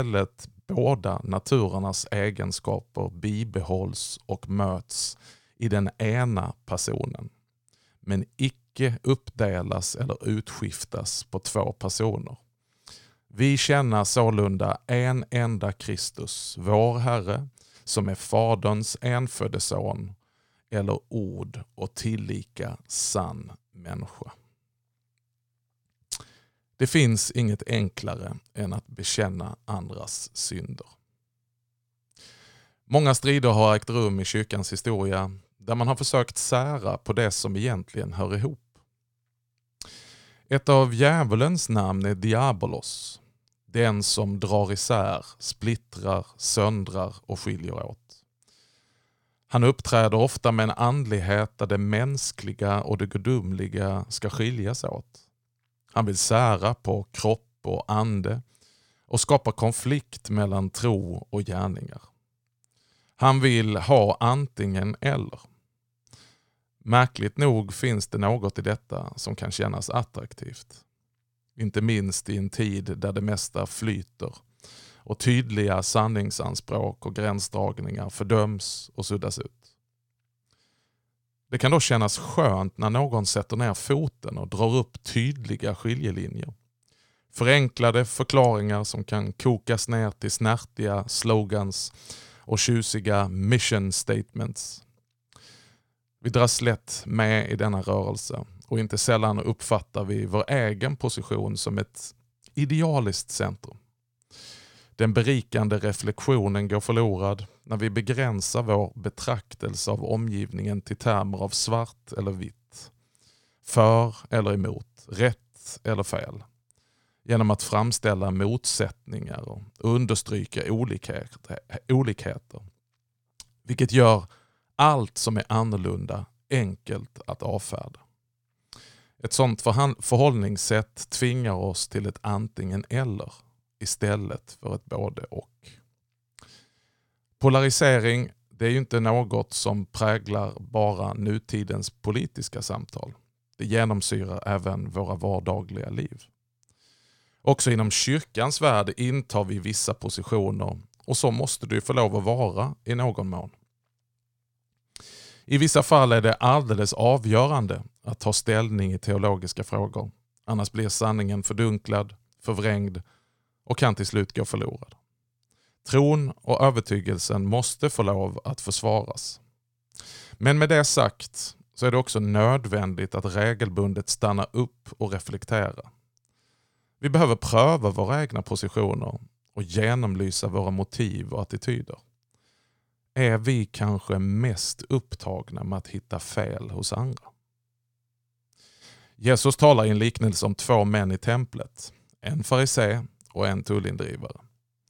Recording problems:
abrupt cut into speech; at the start

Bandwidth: 17 kHz